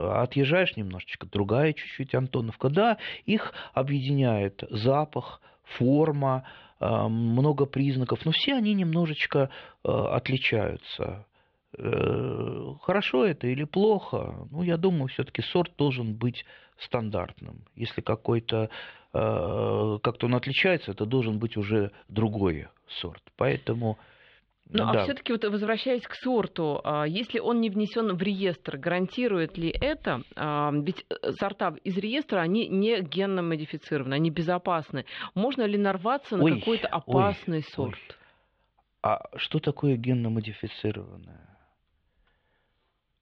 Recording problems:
muffled; slightly; fading above 4 kHz
abrupt cut into speech; at the start

